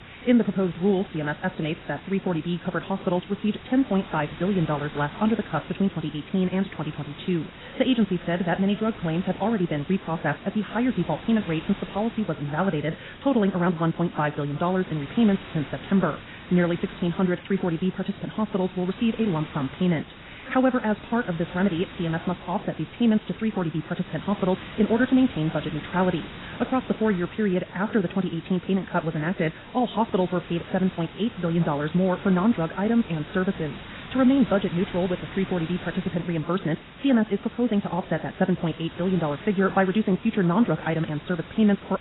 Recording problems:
garbled, watery; badly; nothing above 4 kHz
wrong speed, natural pitch; too fast; 1.6 times normal speed
hiss; noticeable; throughout; 15 dB below the speech

